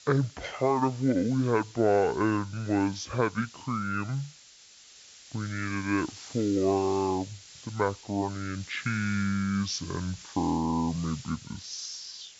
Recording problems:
wrong speed and pitch; too slow and too low; 0.6 times normal speed
high frequencies cut off; slight; nothing above 8 kHz
hiss; noticeable; throughout; 15 dB below the speech

